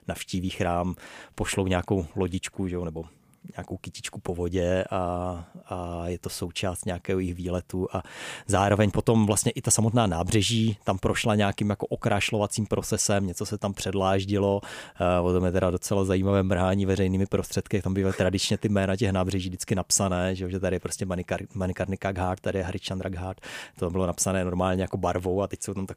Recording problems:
none

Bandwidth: 15 kHz